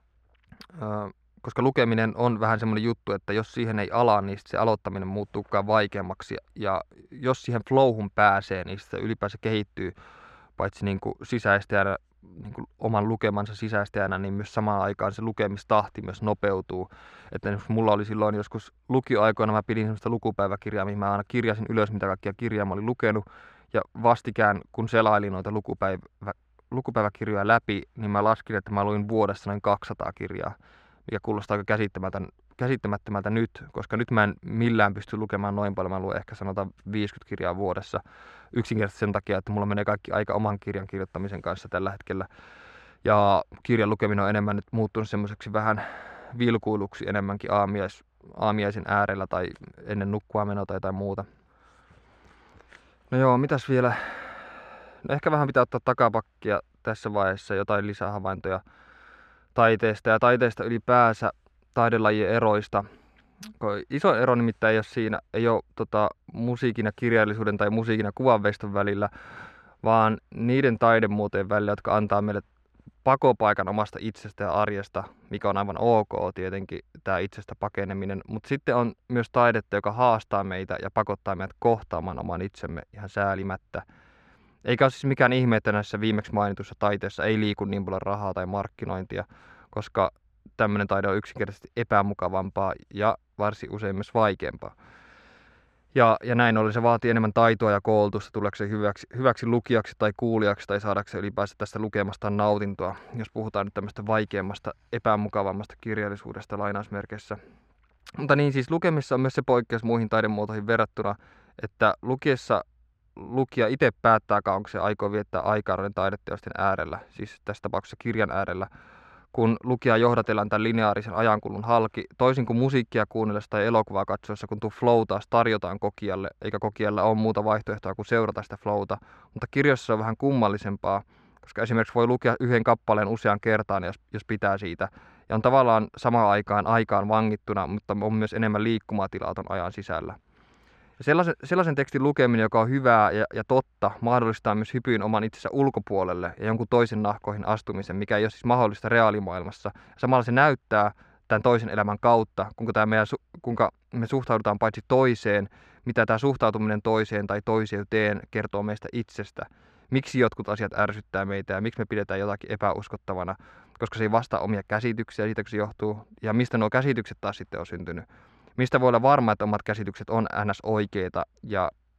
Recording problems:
muffled; very; fading above 2.5 kHz

